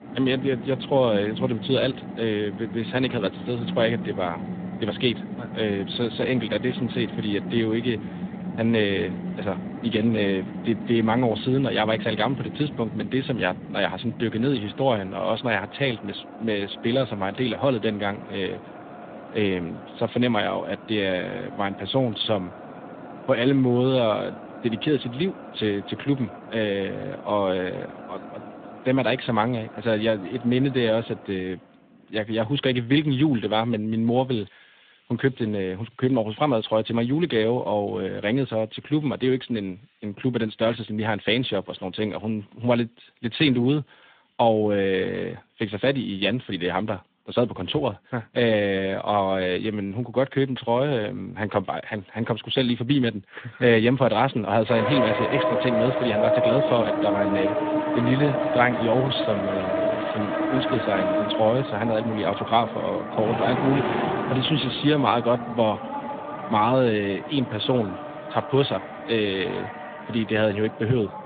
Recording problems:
phone-call audio; nothing above 3.5 kHz
traffic noise; loud; throughout; 6 dB below the speech

